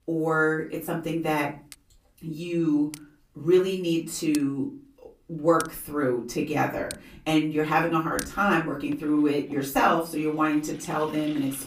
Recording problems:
off-mic speech; far
room echo; slight; dies away in 0.3 s
household noises; noticeable; throughout; 15 dB below the speech

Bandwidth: 15 kHz